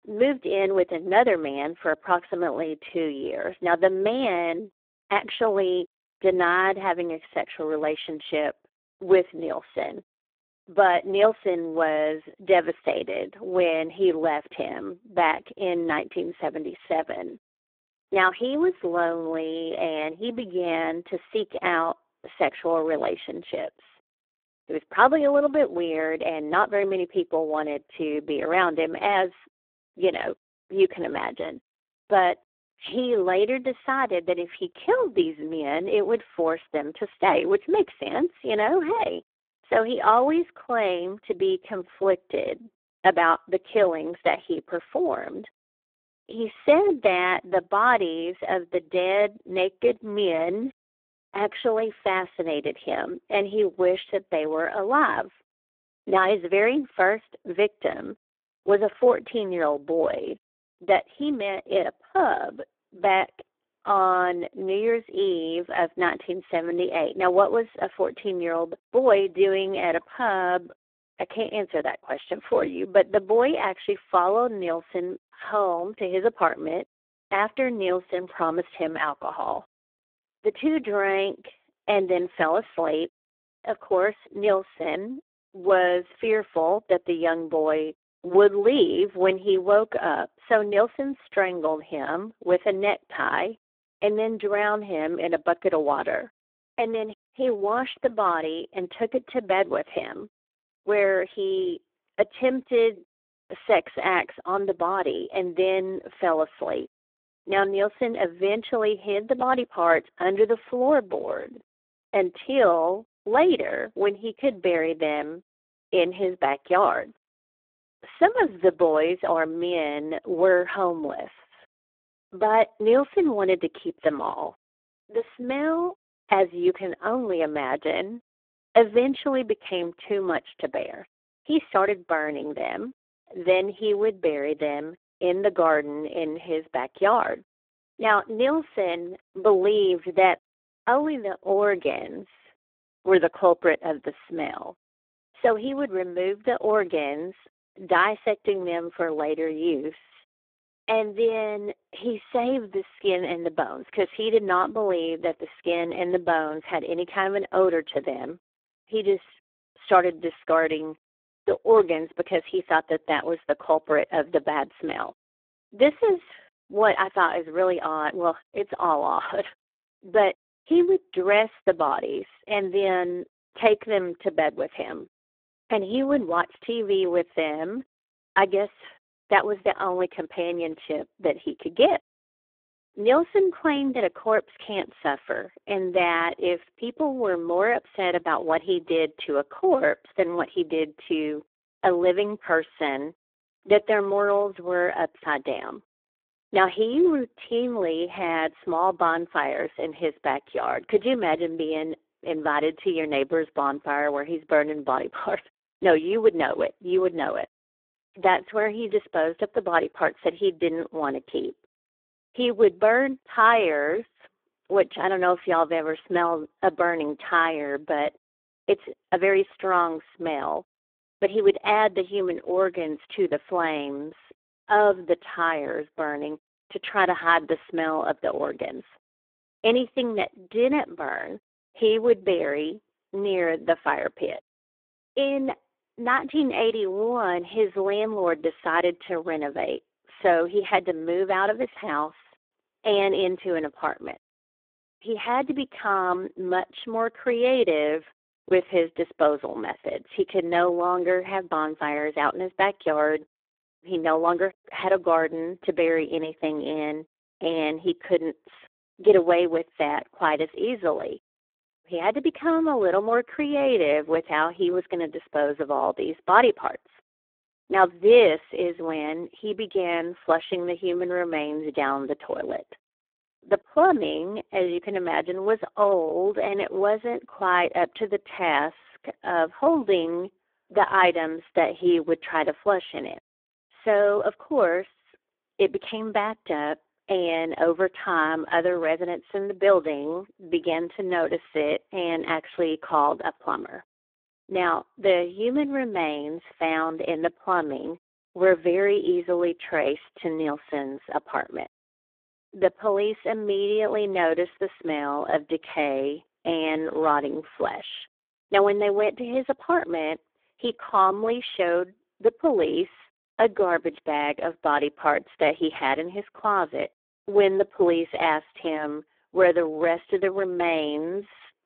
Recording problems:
phone-call audio; poor line

